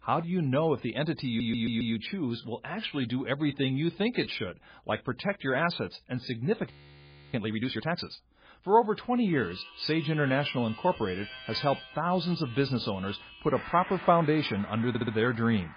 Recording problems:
garbled, watery; badly
background music; noticeable; from 9 s on; 15 dB below the speech
audio stuttering; at 1.5 s and at 15 s
audio freezing; at 6.5 s for 0.5 s

